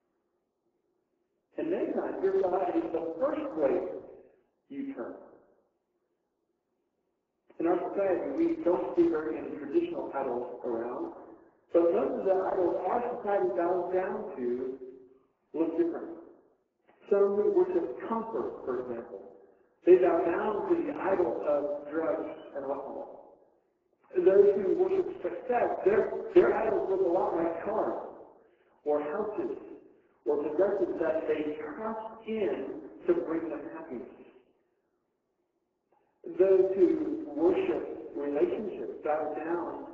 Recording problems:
off-mic speech; far
garbled, watery; badly
room echo; noticeable; dies away in 1 s
phone-call audio; nothing above 7.5 kHz
muffled; very slightly; fading above 1 kHz

